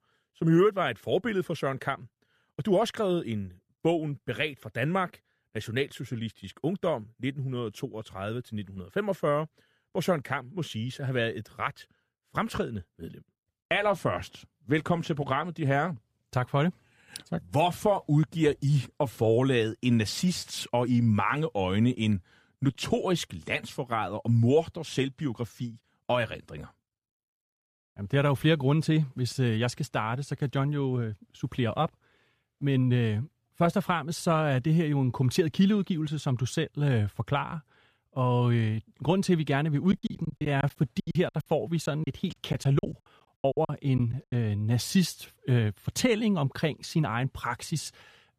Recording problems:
choppy; very; from 40 to 44 s; 19% of the speech affected

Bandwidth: 14.5 kHz